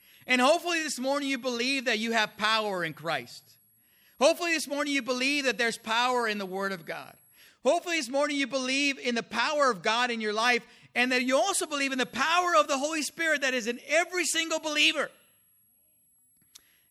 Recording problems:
high-pitched whine; faint; until 7.5 s and from 11 s on; 11.5 kHz, 35 dB below the speech

